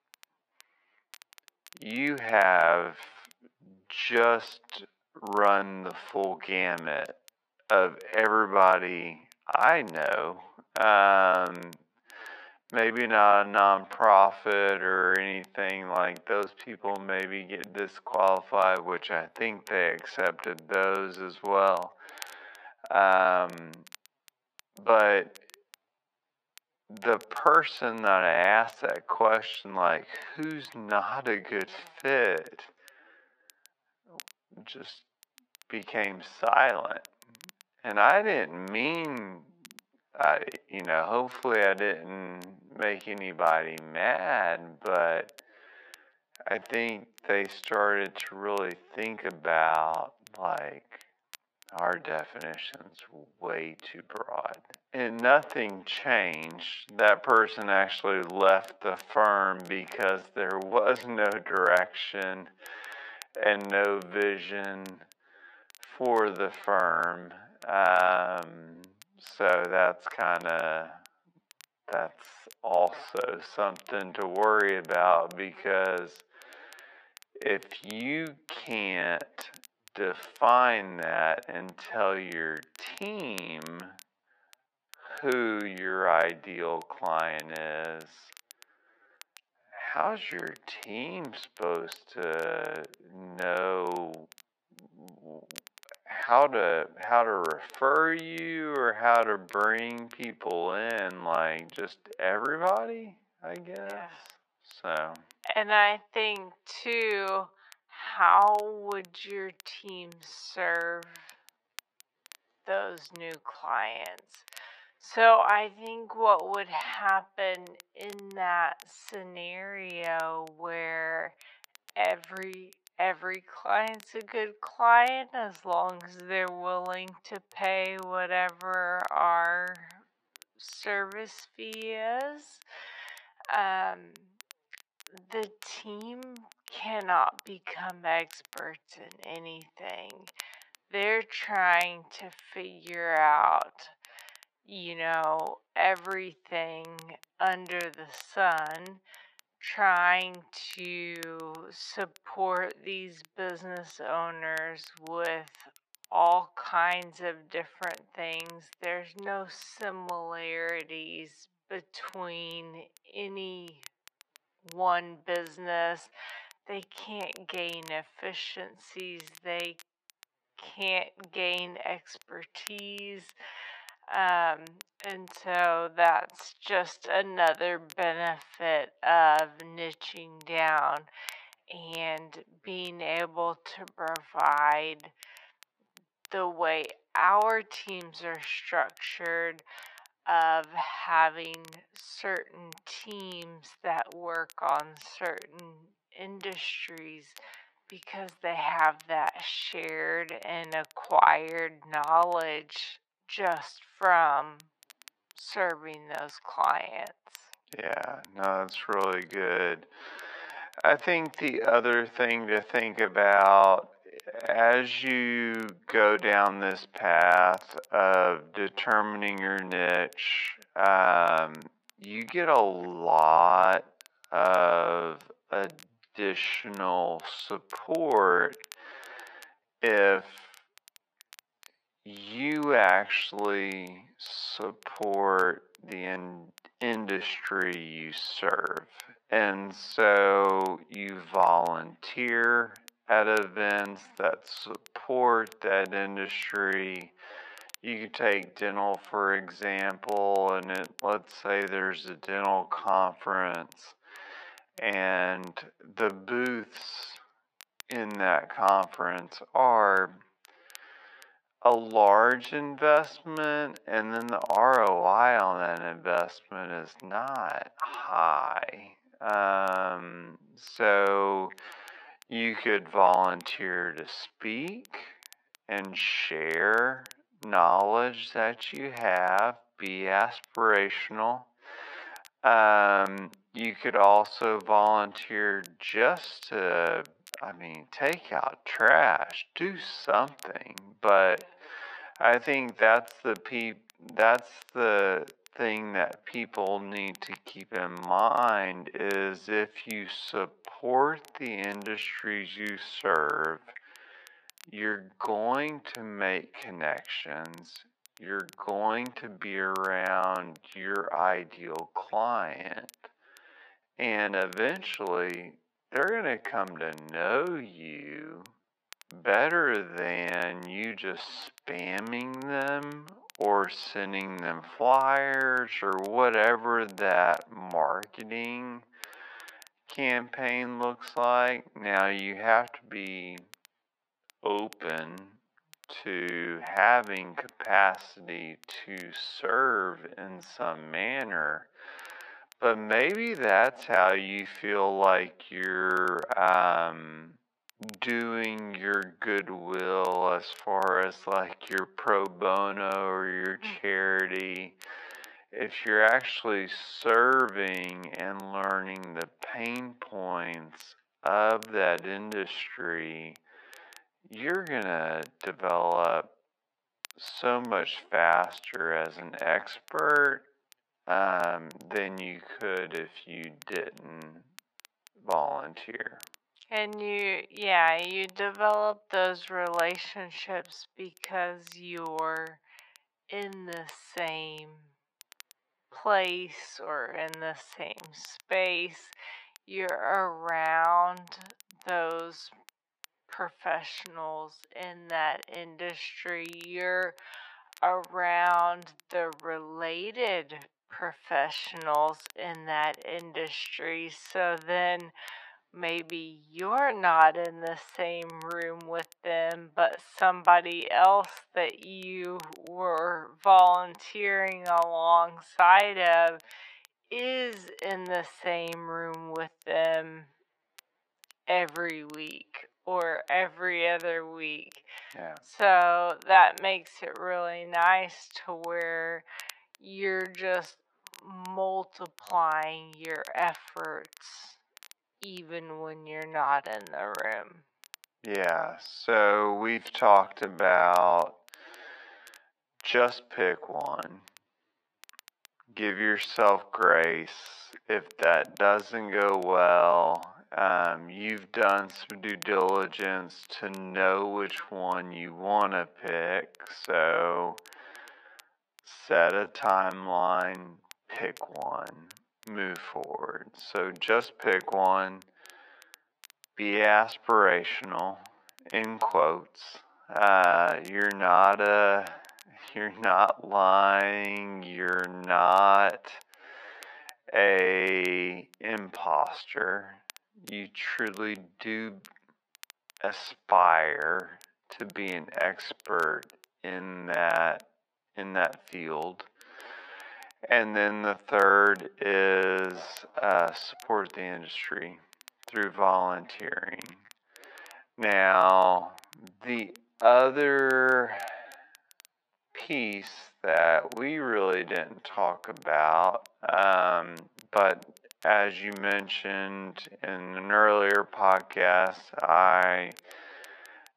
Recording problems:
thin; very; fading below 700 Hz
wrong speed, natural pitch; too slow; 0.5 times normal speed
muffled; slightly; fading above 1.5 kHz
crackle, like an old record; faint; 25 dB below the speech

